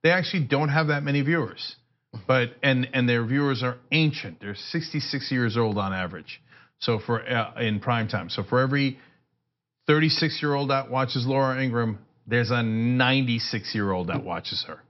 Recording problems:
high frequencies cut off; noticeable; nothing above 5.5 kHz

